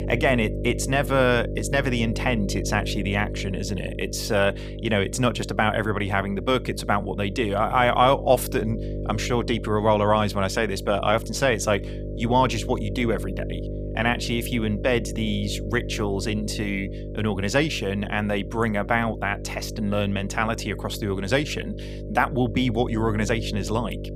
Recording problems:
electrical hum; noticeable; throughout; 50 Hz, 15 dB below the speech

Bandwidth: 15 kHz